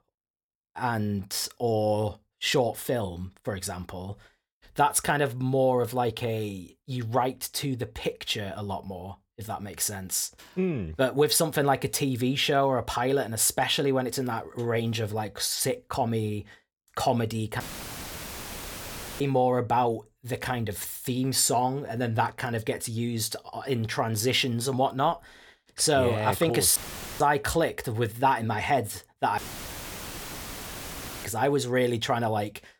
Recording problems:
audio cutting out; filled with static; at 18 s for 1.5 s, at 27 s and at 29 s for 2 s

